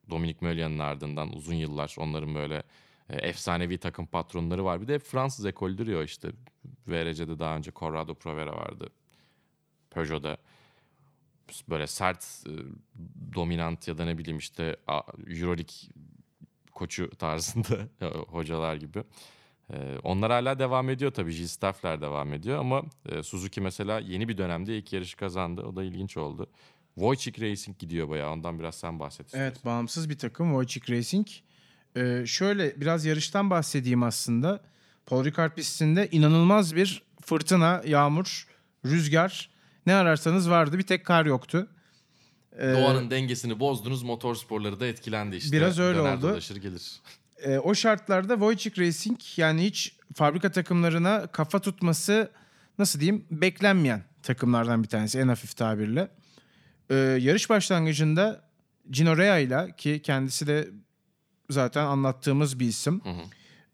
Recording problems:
none

